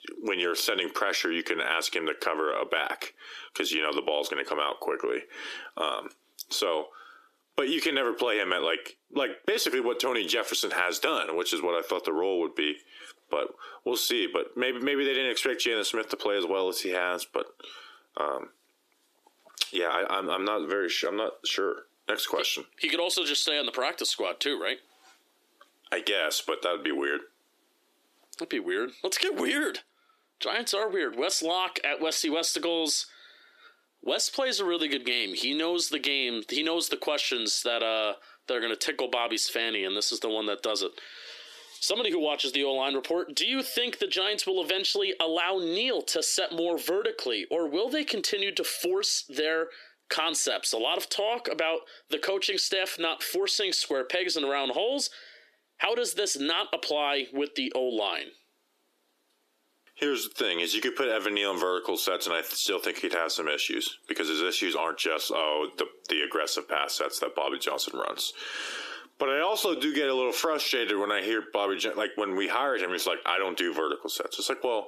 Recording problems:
squashed, flat; heavily
thin; somewhat; fading below 300 Hz

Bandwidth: 14.5 kHz